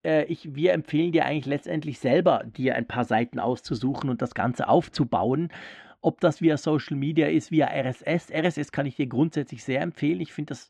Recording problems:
muffled; very; fading above 2.5 kHz

